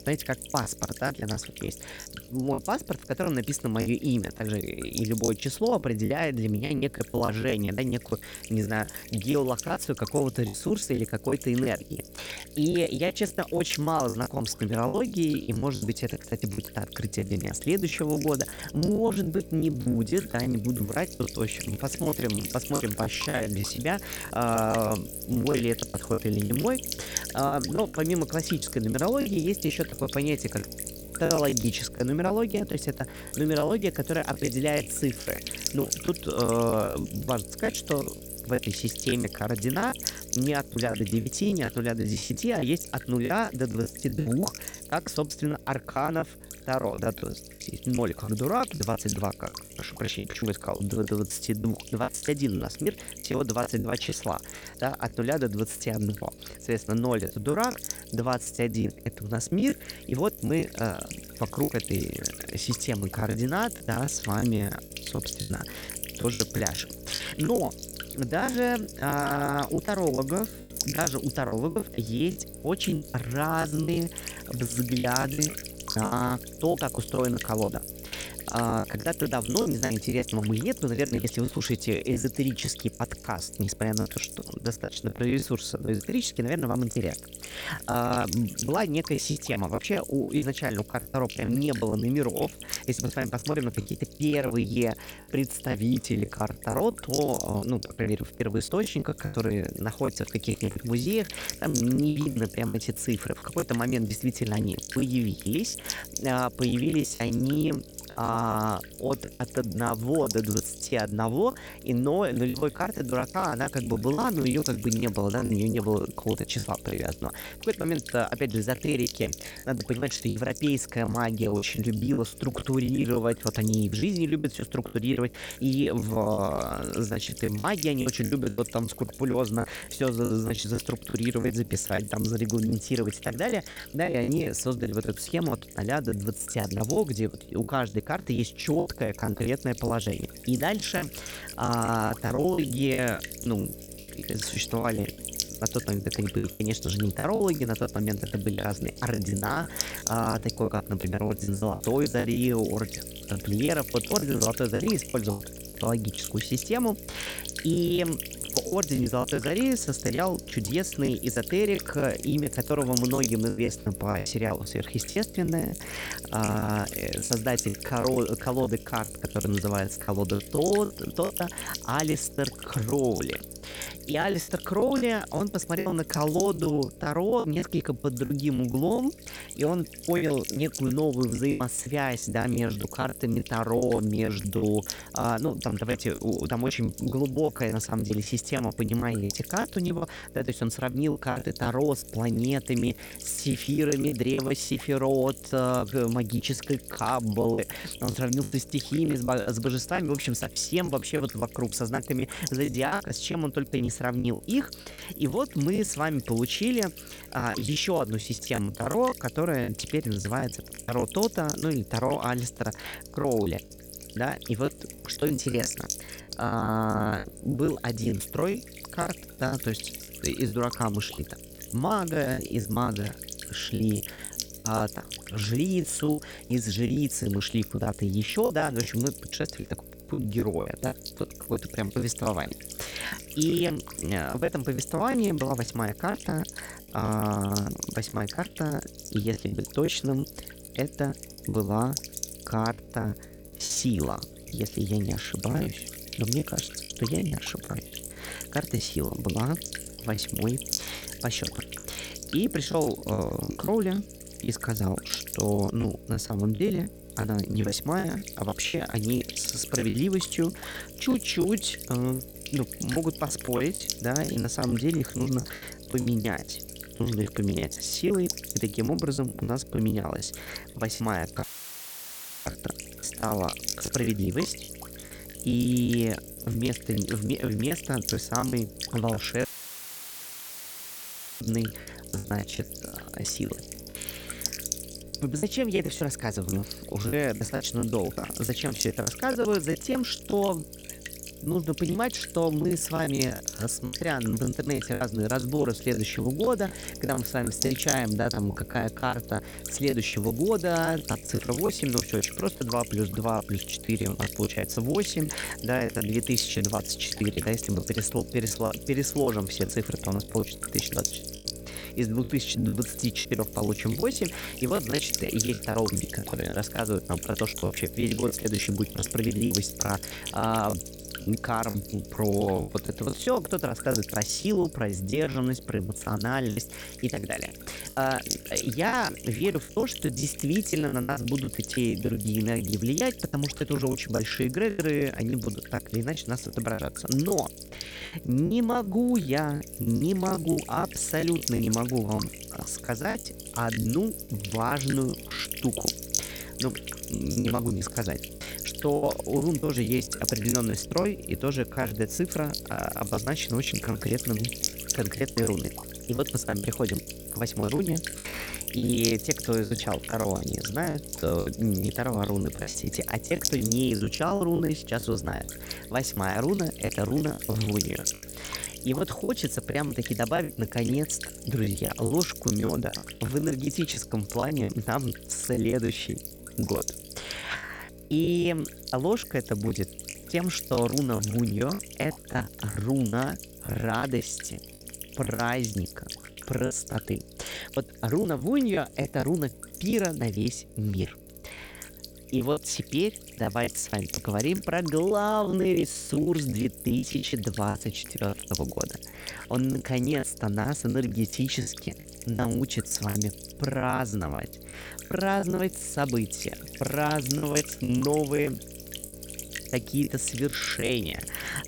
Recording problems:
electrical hum; loud; throughout; 60 Hz, 8 dB below the speech
choppy; very; 14% of the speech affected
audio cutting out; filled with static; at 4:31 for 1 s and at 4:39 for 2 s

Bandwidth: 18.5 kHz